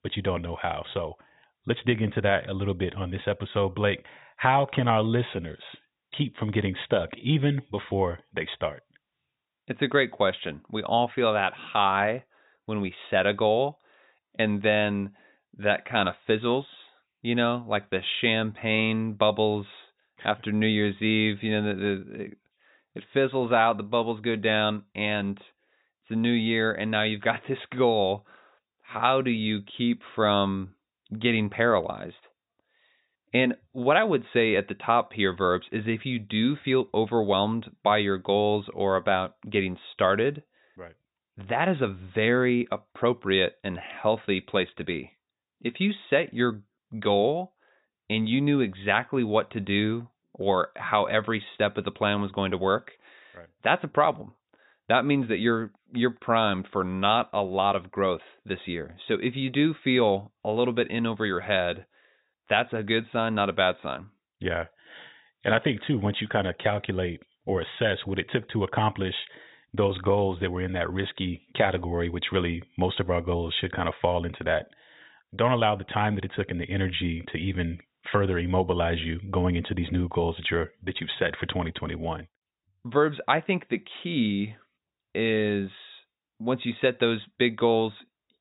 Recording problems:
high frequencies cut off; severe; nothing above 4 kHz

